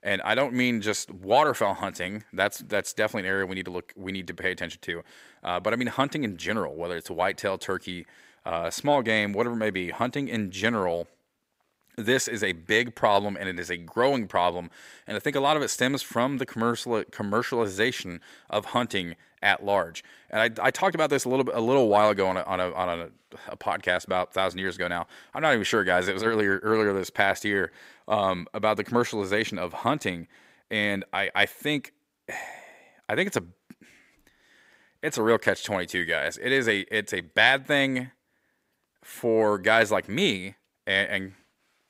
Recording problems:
none

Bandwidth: 15.5 kHz